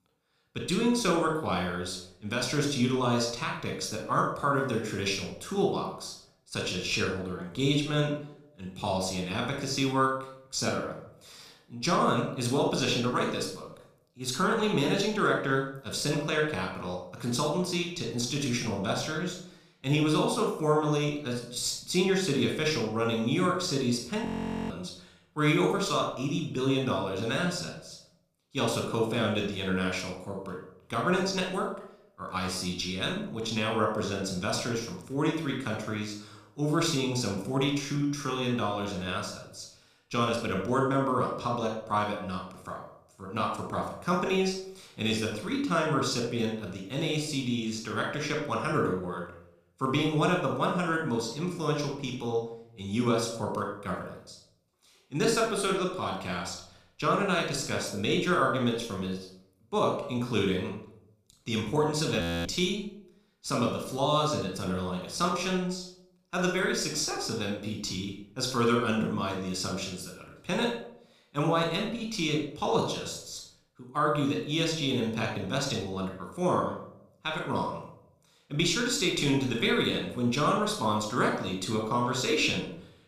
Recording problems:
room echo; noticeable; dies away in 0.5 s
off-mic speech; somewhat distant
audio freezing; at 24 s and at 1:02

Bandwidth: 14.5 kHz